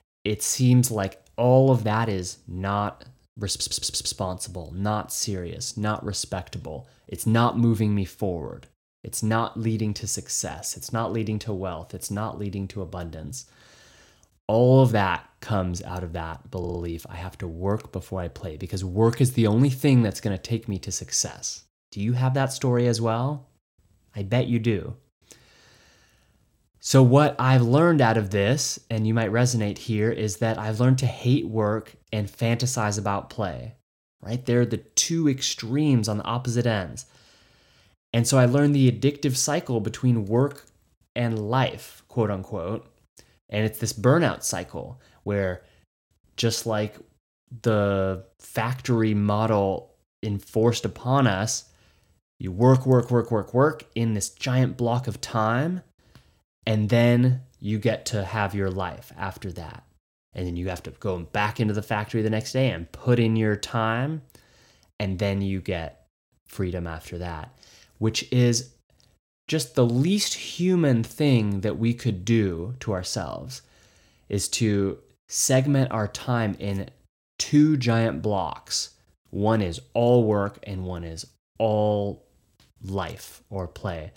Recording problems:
audio stuttering; at 3.5 s and at 17 s

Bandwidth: 16.5 kHz